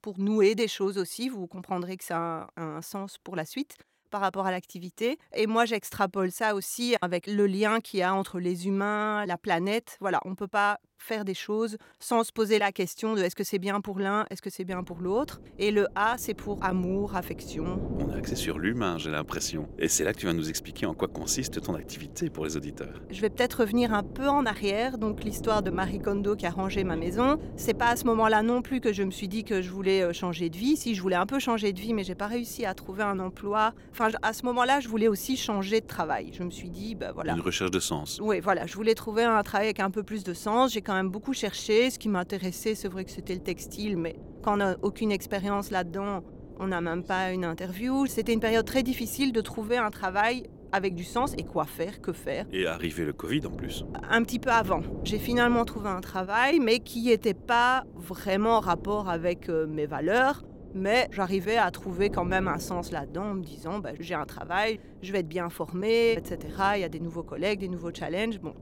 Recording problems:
wind noise on the microphone; occasional gusts; from 15 s on; 20 dB below the speech

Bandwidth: 16.5 kHz